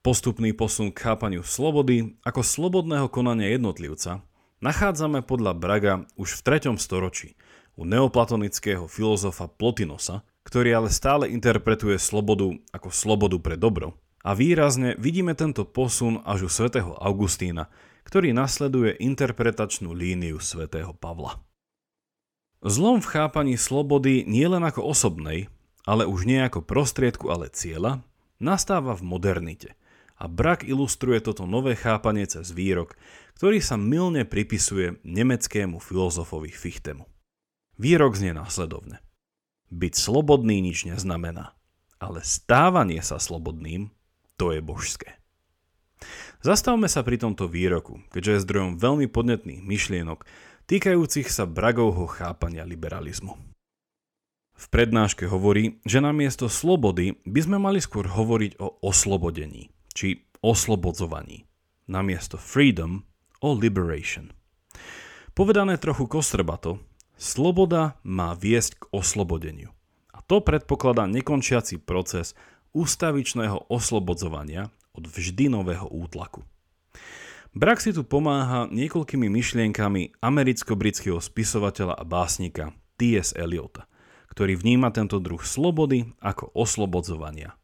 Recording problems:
none

